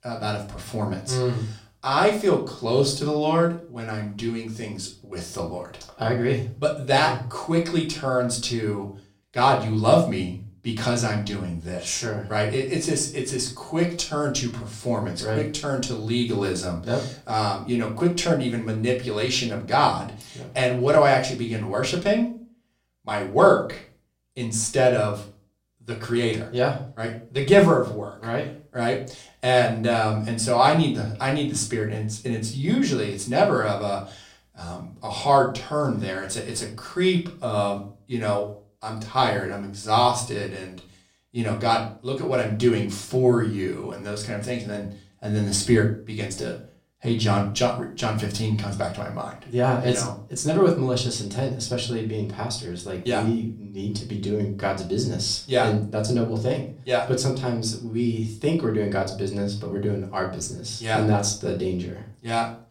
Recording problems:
off-mic speech; far
room echo; very slight; dies away in 0.3 s

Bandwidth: 16 kHz